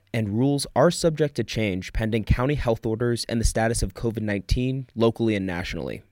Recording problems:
none

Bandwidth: 16 kHz